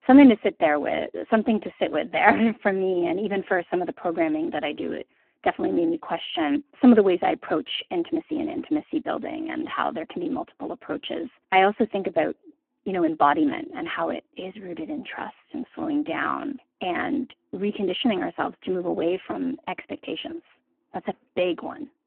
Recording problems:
phone-call audio; poor line

